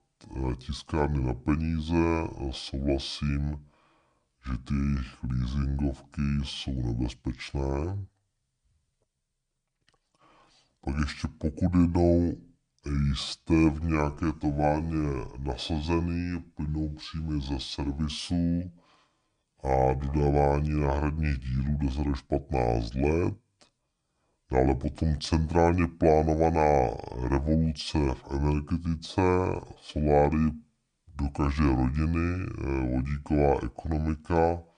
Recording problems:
wrong speed and pitch; too slow and too low; 0.6 times normal speed

